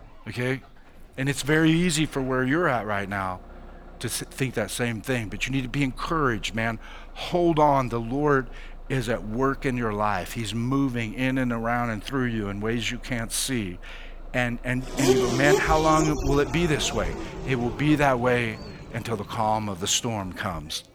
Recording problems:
traffic noise; loud; throughout; 5 dB below the speech

